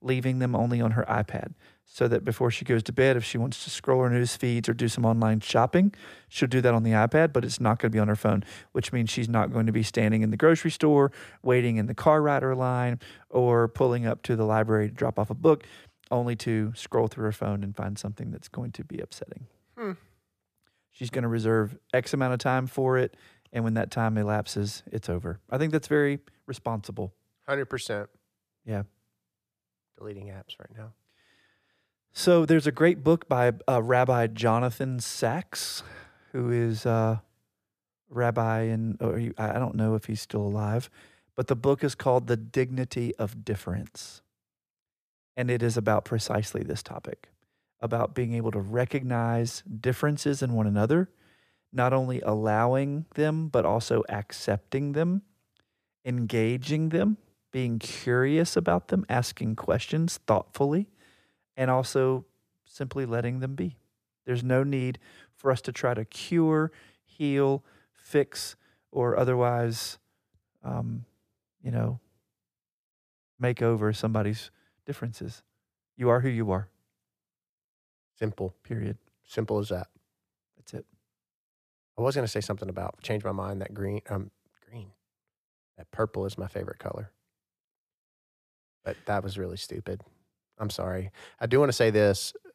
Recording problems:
none

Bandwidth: 14.5 kHz